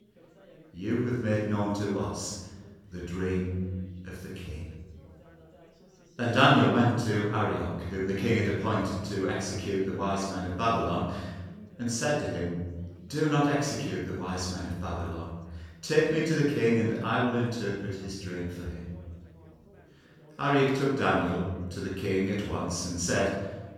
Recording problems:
room echo; strong; dies away in 1.3 s
off-mic speech; far
background chatter; faint; throughout; 3 voices, 25 dB below the speech

